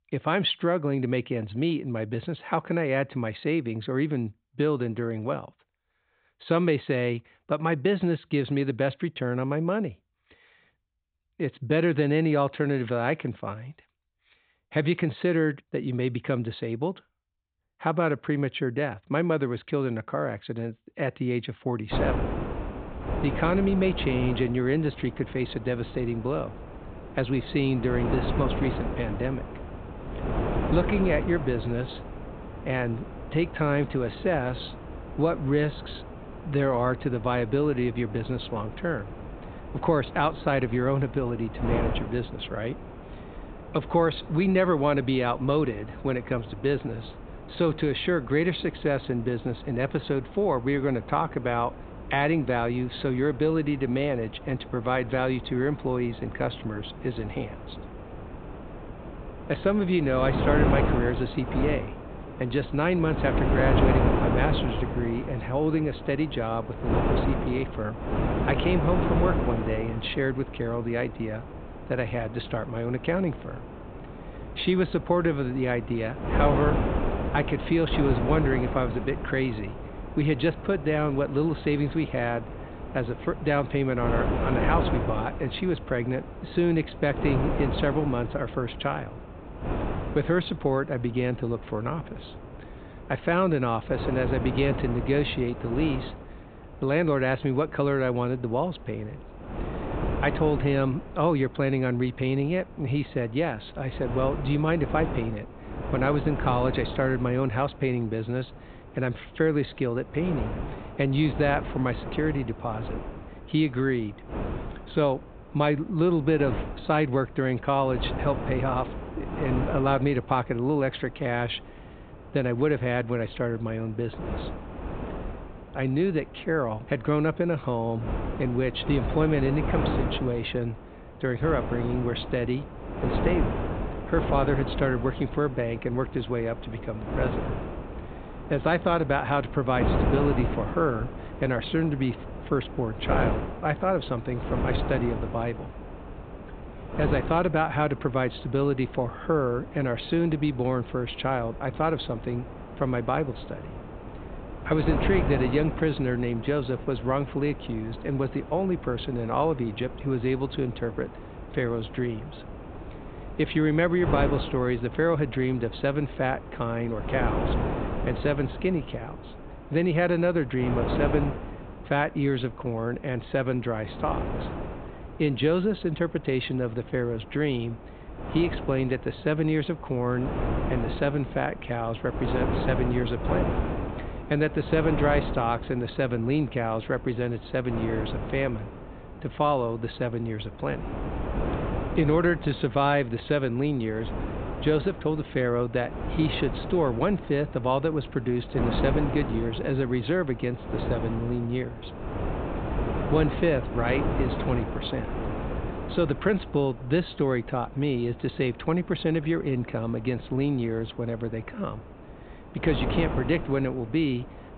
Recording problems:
high frequencies cut off; severe; nothing above 4 kHz
wind noise on the microphone; heavy; from 22 s on; 8 dB below the speech

